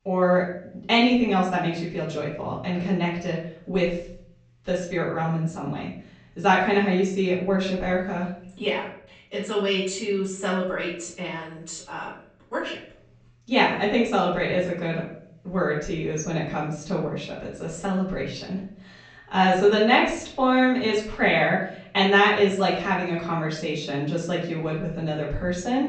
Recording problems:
off-mic speech; far
room echo; noticeable; dies away in 0.5 s
high frequencies cut off; noticeable; nothing above 8 kHz

